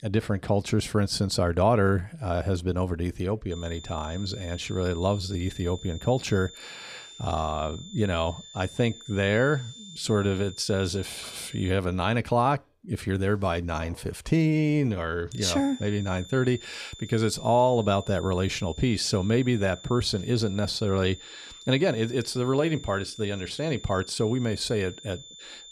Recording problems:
high-pitched whine; noticeable; from 3.5 to 12 s and from 15 s on; 3.5 kHz, 15 dB below the speech

